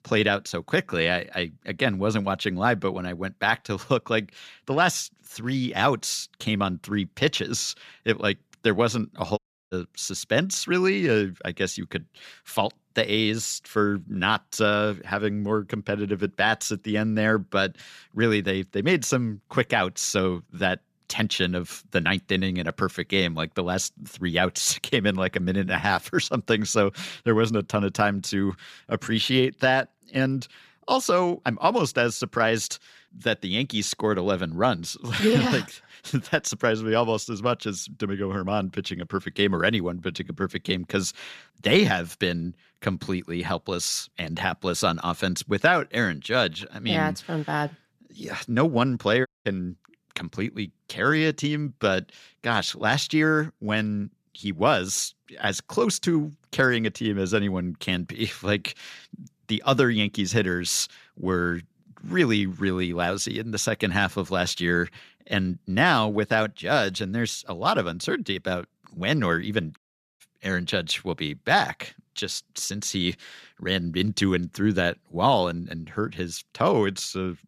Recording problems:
audio cutting out; at 9.5 s, at 49 s and at 1:10

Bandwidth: 14.5 kHz